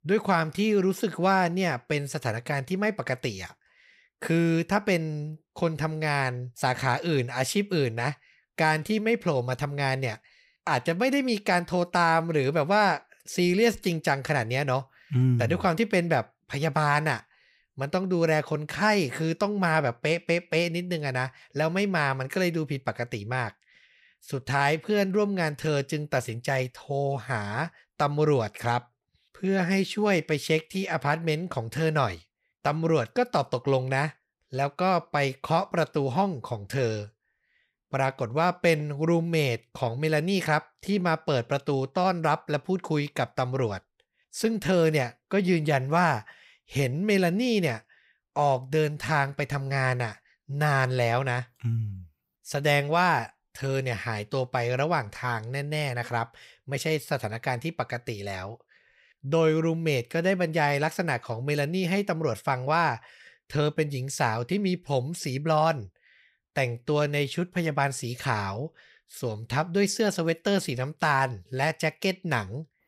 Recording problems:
none

